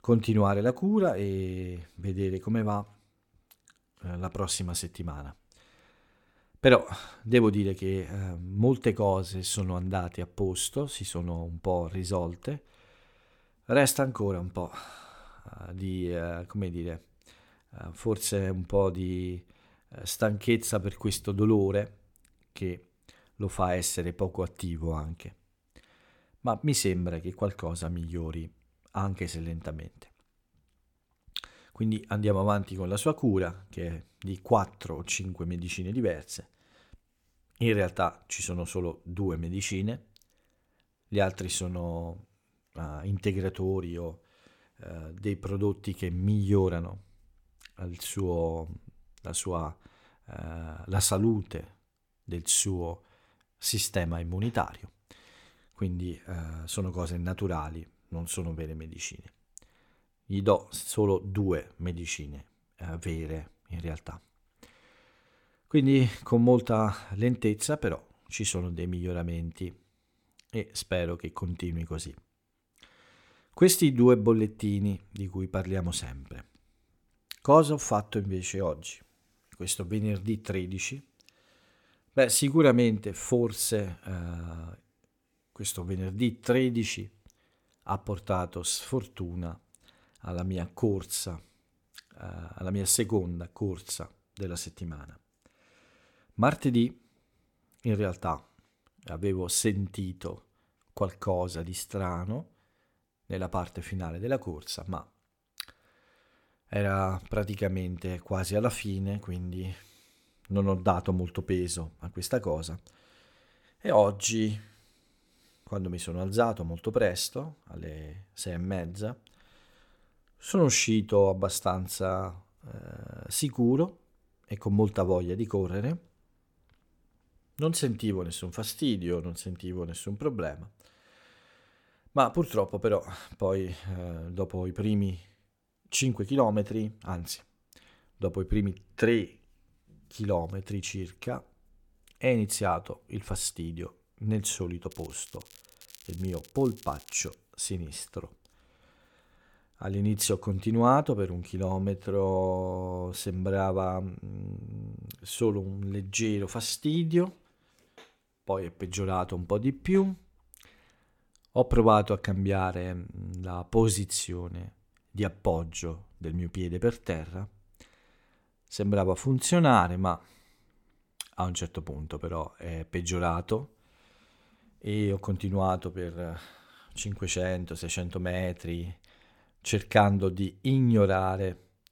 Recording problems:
crackling; faint; from 2:25 to 2:27; 20 dB below the speech

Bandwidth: 17.5 kHz